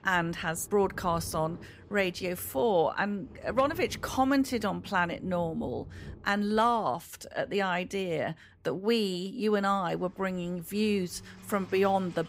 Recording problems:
rain or running water; noticeable; throughout; 20 dB below the speech

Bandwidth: 15.5 kHz